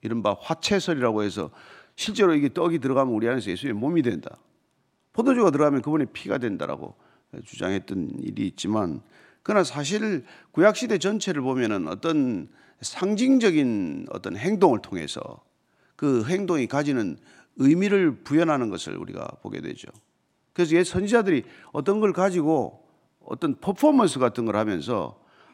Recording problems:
none

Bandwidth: 16 kHz